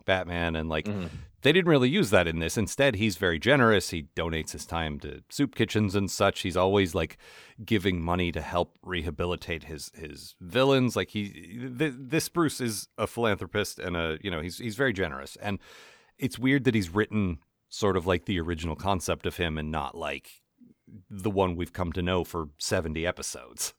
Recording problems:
none

